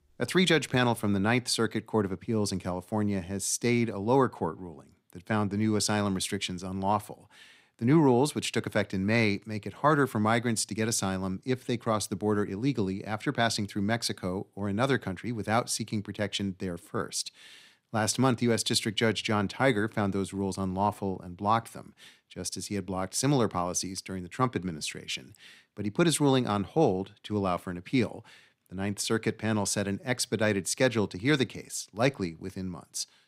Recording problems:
none

